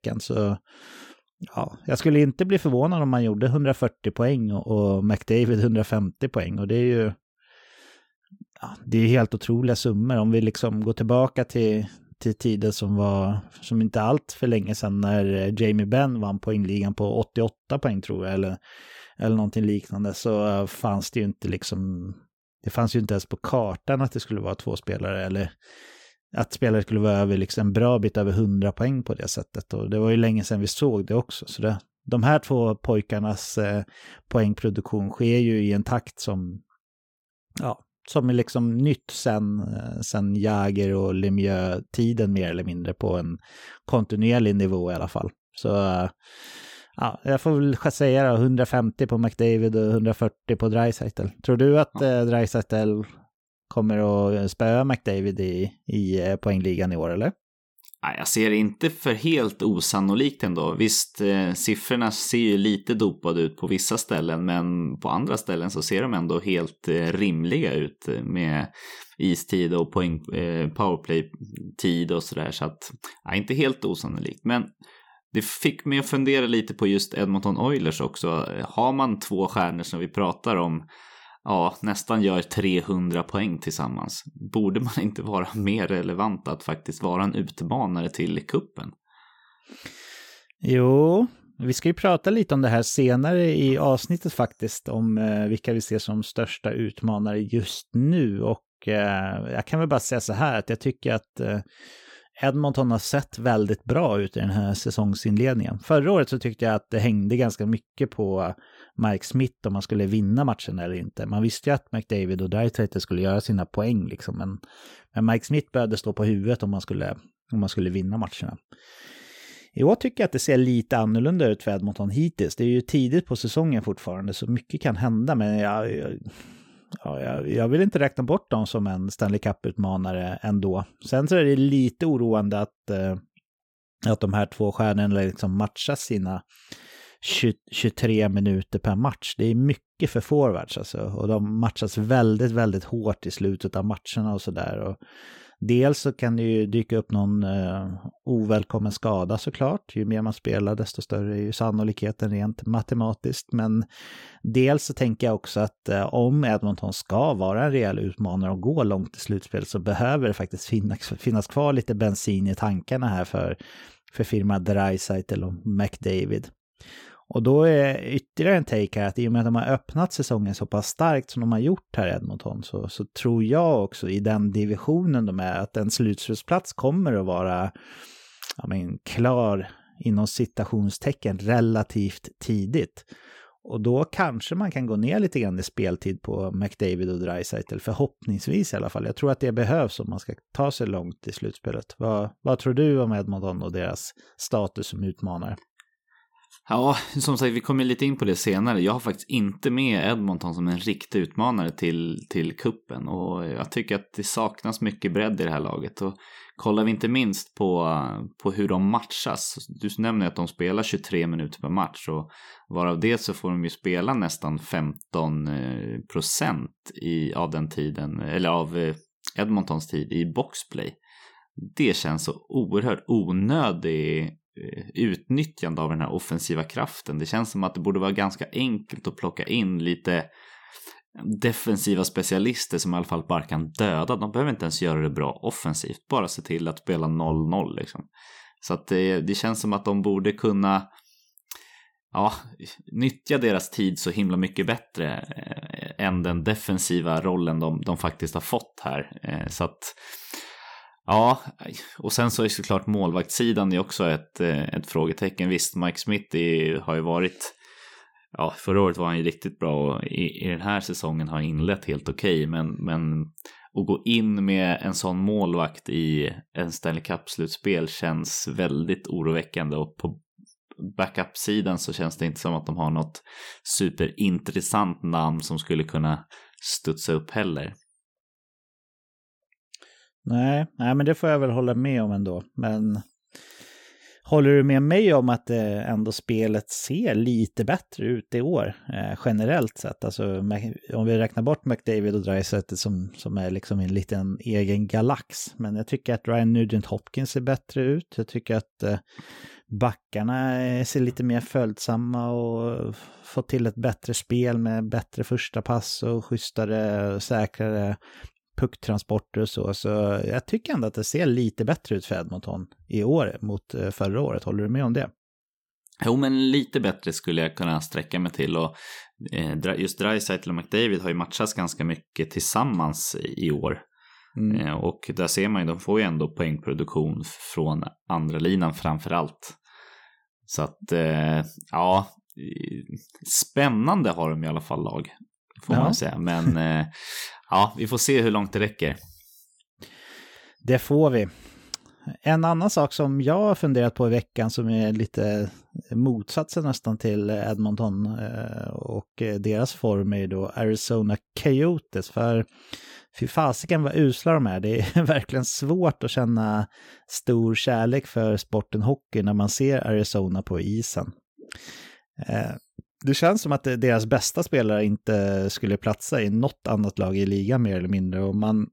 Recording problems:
none

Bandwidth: 17.5 kHz